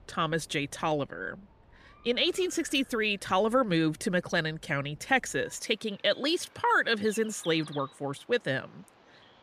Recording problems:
animal sounds; faint; throughout; 25 dB below the speech

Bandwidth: 14.5 kHz